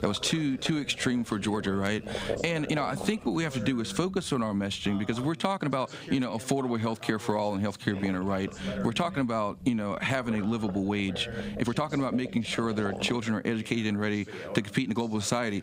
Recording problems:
squashed, flat; somewhat, background pumping
voice in the background; noticeable; throughout; 15 dB below the speech
low rumble; noticeable; until 5.5 s and from 8 to 13 s; 10 dB below the speech
uneven, jittery; strongly; from 0.5 to 15 s

